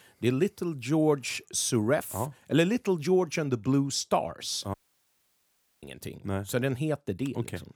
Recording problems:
audio cutting out; at 4.5 s for 1 s

